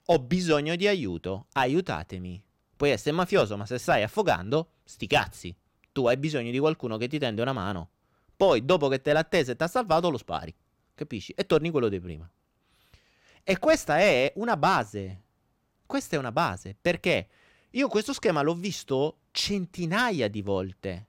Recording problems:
none

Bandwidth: 16 kHz